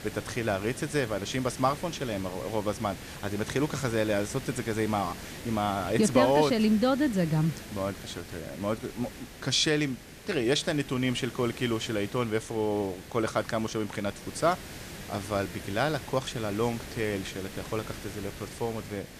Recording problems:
hiss; noticeable; throughout; 15 dB below the speech

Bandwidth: 14.5 kHz